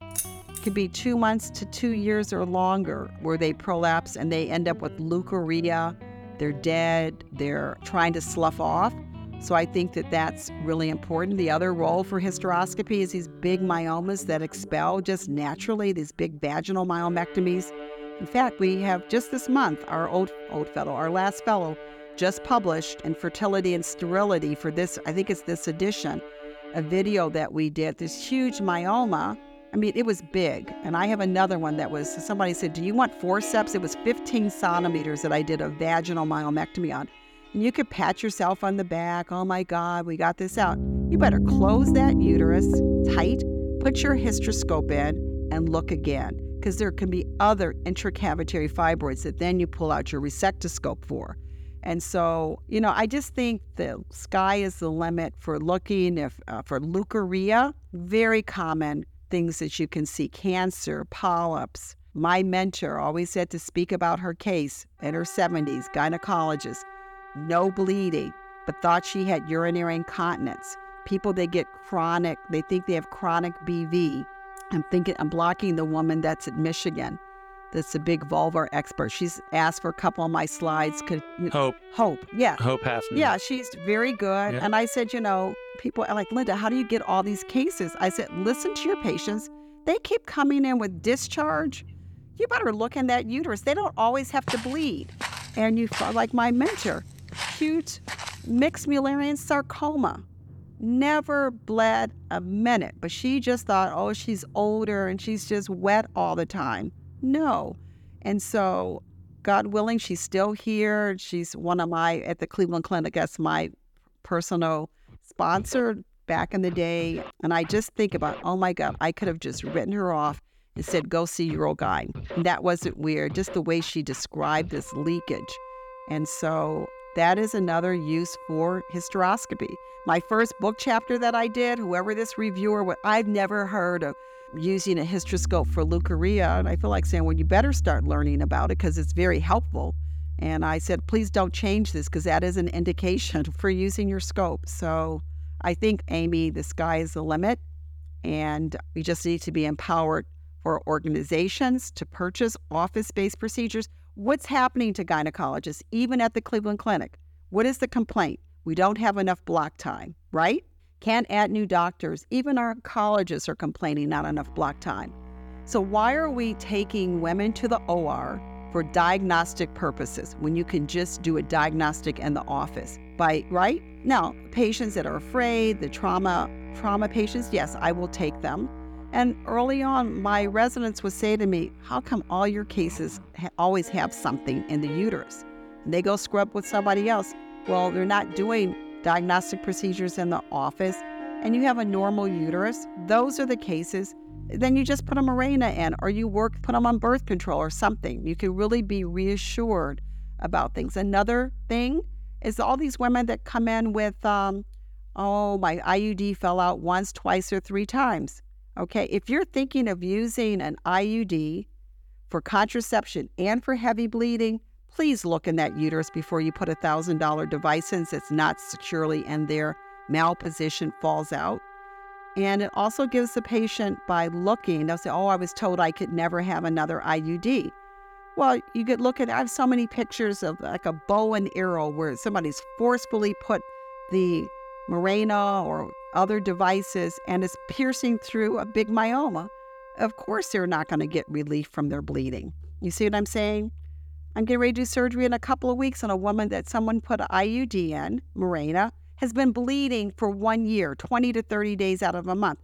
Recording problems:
background music; noticeable; throughout; 10 dB below the speech
jangling keys; noticeable; at the start; peak 5 dB below the speech
footsteps; noticeable; from 1:34 to 1:38; peak 6 dB below the speech

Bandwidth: 17.5 kHz